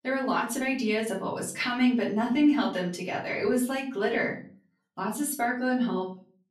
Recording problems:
off-mic speech; far
room echo; slight; dies away in 0.4 s

